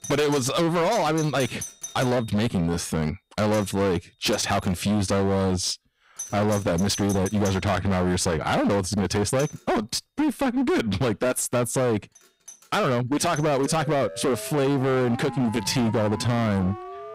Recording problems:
distortion; heavy; 24% of the sound clipped
alarms or sirens; noticeable; throughout; 15 dB below the speech
uneven, jittery; strongly; from 1 to 17 s

